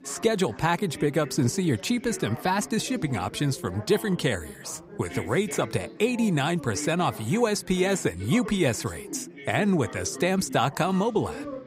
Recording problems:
background chatter; noticeable; throughout; 4 voices, 15 dB below the speech

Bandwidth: 15.5 kHz